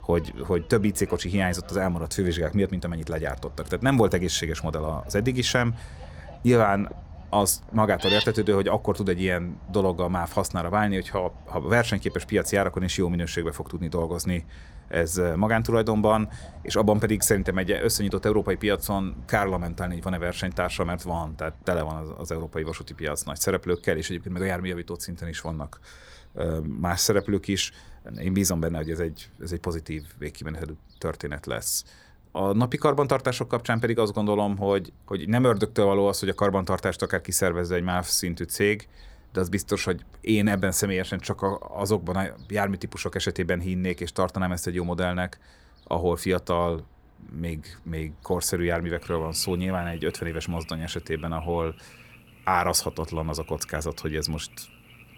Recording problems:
animal sounds; noticeable; throughout; 15 dB below the speech

